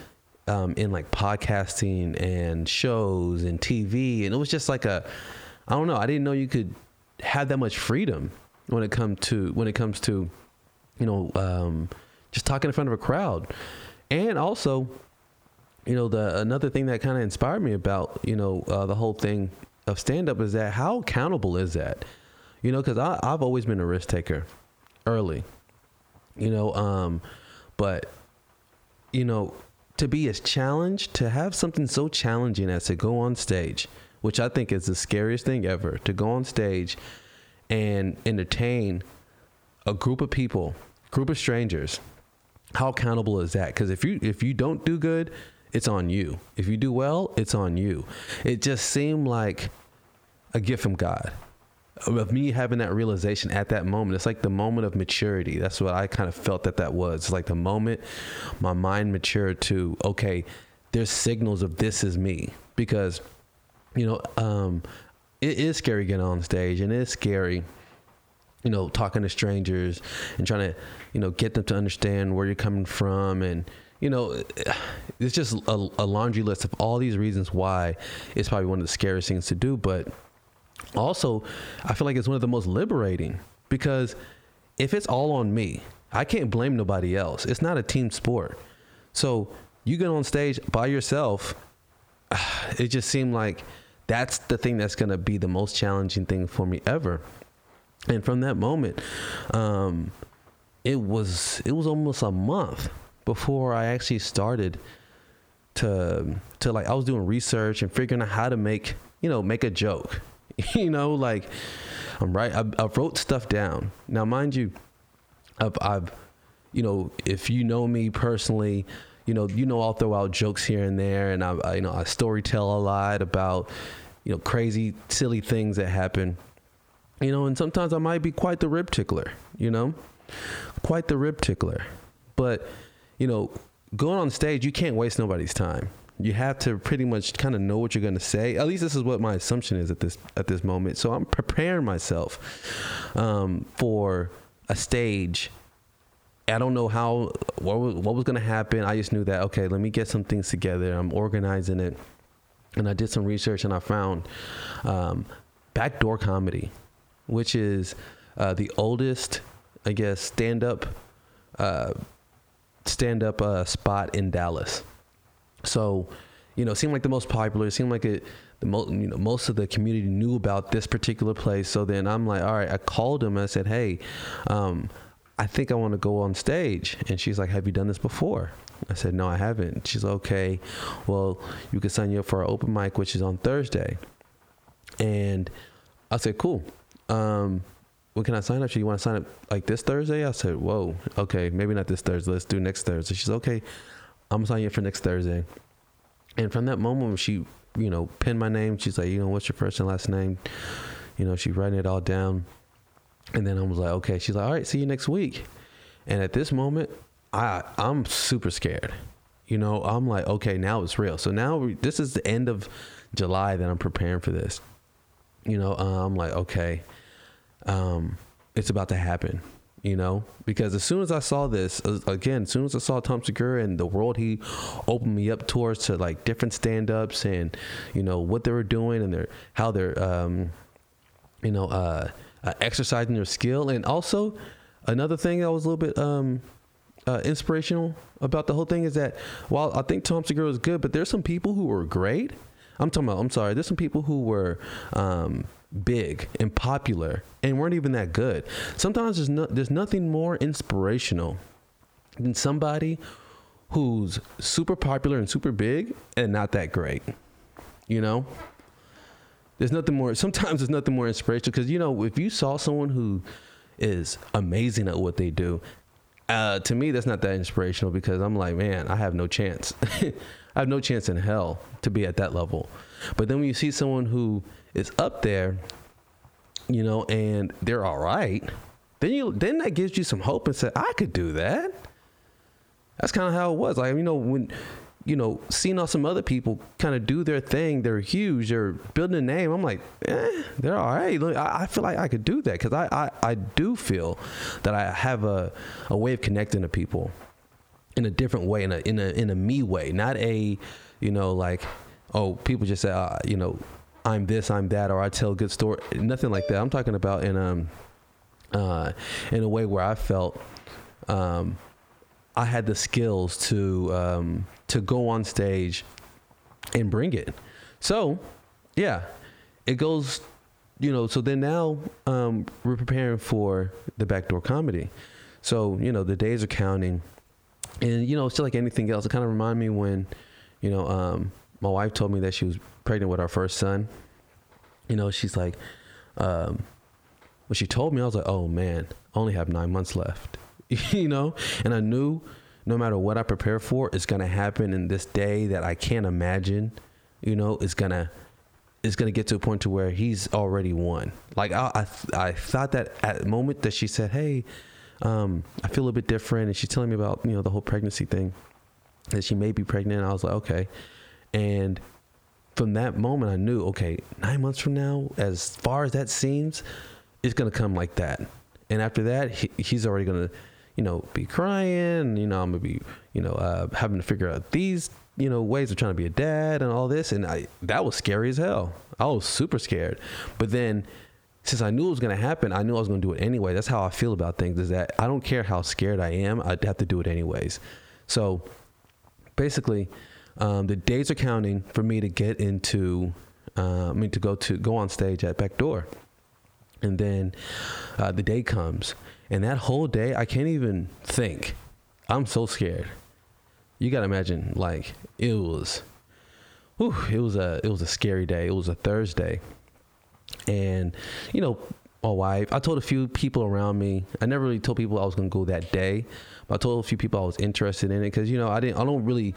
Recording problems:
squashed, flat; heavily

